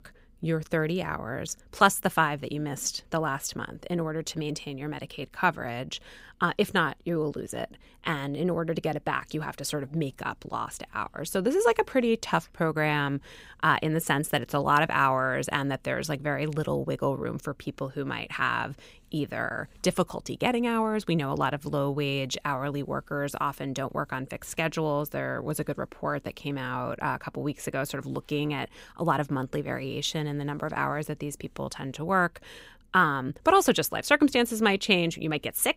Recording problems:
none

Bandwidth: 15.5 kHz